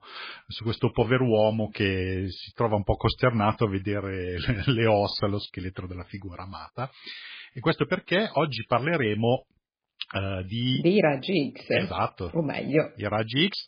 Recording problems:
garbled, watery; badly; nothing above 5 kHz

